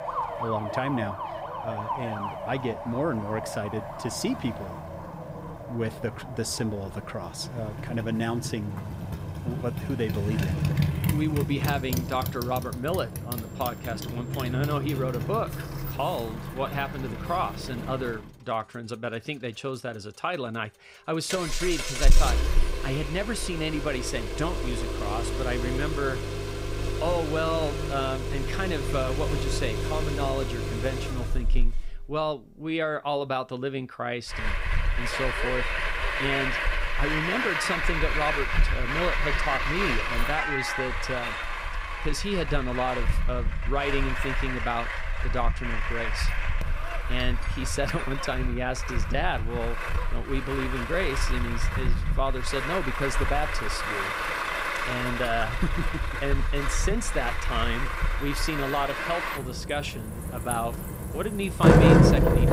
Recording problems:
traffic noise; very loud; throughout; 2 dB above the speech

